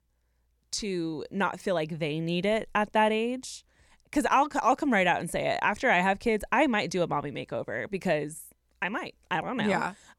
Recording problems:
none

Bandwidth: 17 kHz